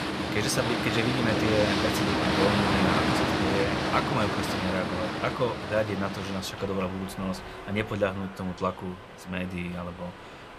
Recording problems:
train or aircraft noise; very loud; throughout; 3 dB above the speech

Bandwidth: 14.5 kHz